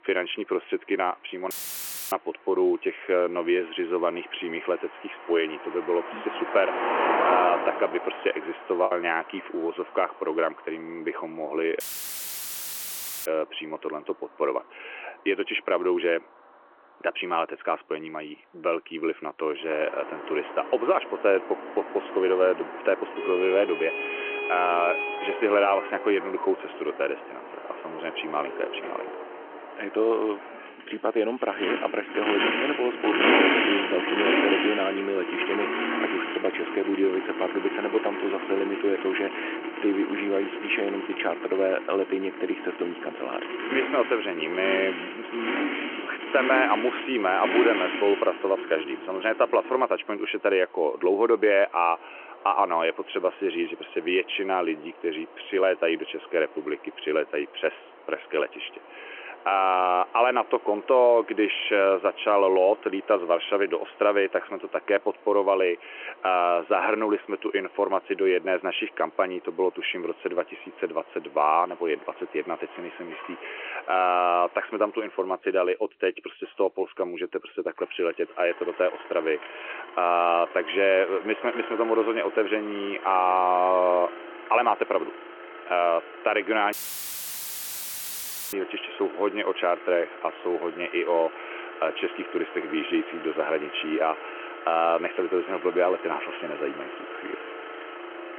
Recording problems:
phone-call audio
traffic noise; loud; throughout; 6 dB below the speech
audio cutting out; filled with static; at 1.5 s for 0.5 s, at 12 s for 1.5 s and at 1:27 for 2 s
choppy; occasionally; from 8 to 9 s; 4% of the speech affected

